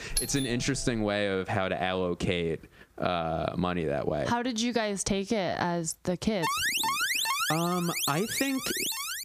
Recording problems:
squashed, flat; somewhat
doorbell; noticeable; at the start; peak 1 dB below the speech
alarm; loud; from 6.5 s on; peak 4 dB above the speech

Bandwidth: 15 kHz